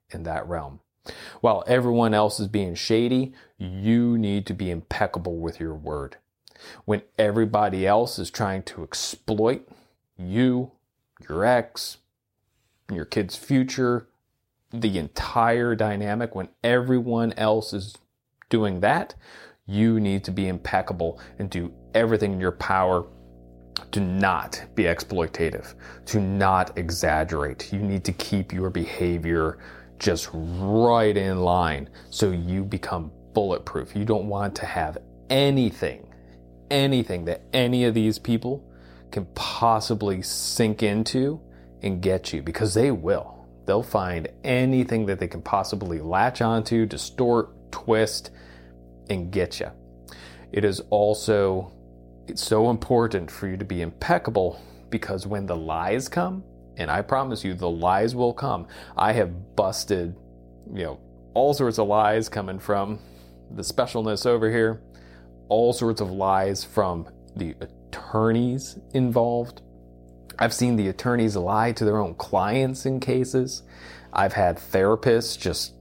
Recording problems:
electrical hum; faint; from 20 s on; 60 Hz, 30 dB below the speech

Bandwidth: 16 kHz